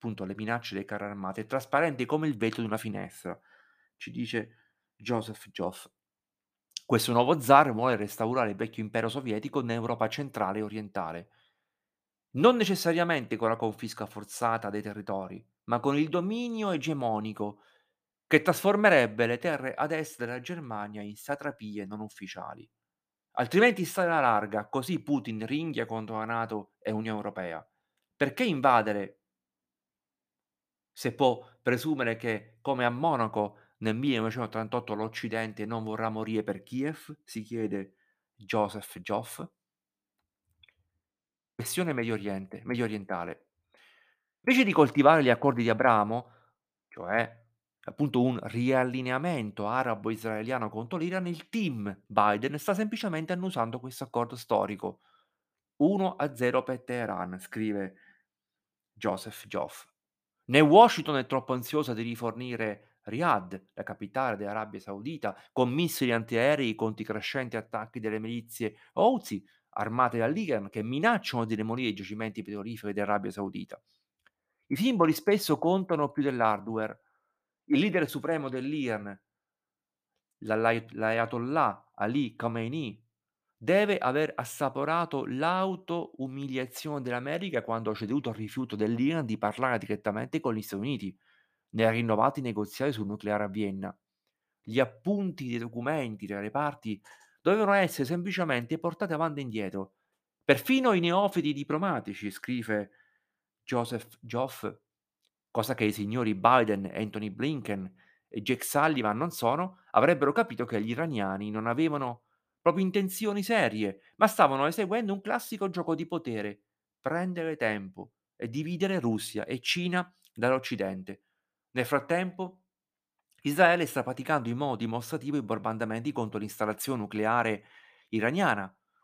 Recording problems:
none

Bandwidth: 15 kHz